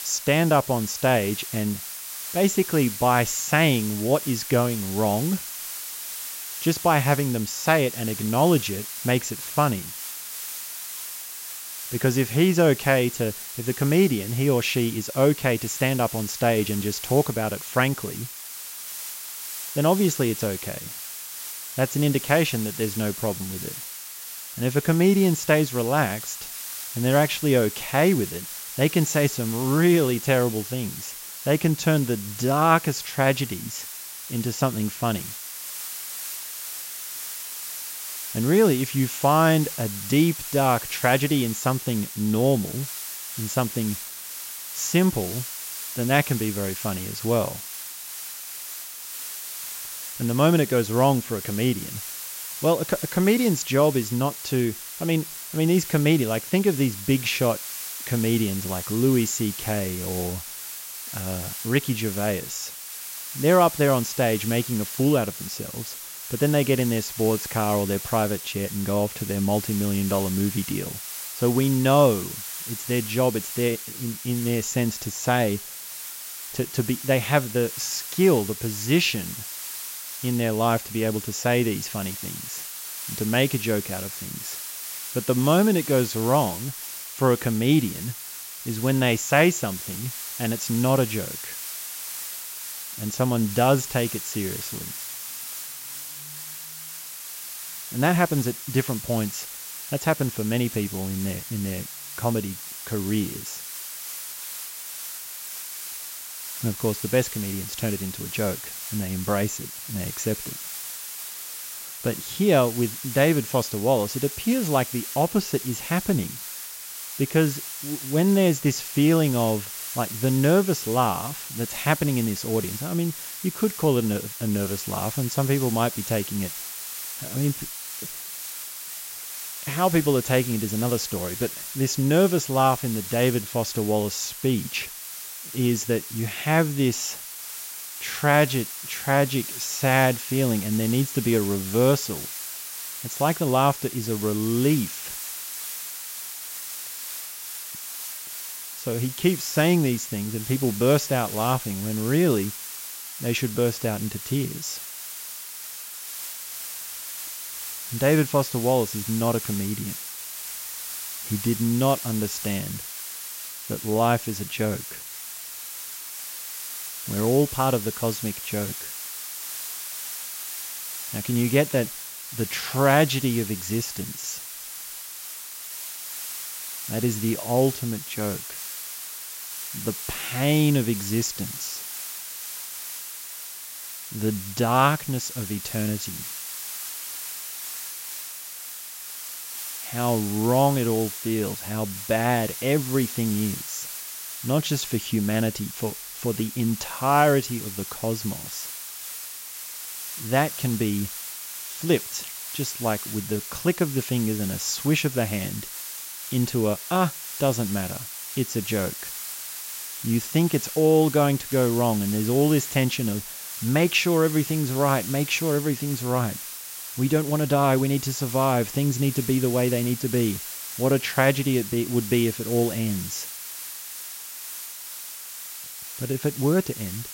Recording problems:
high frequencies cut off; noticeable; nothing above 8 kHz
hiss; loud; throughout; 8 dB below the speech

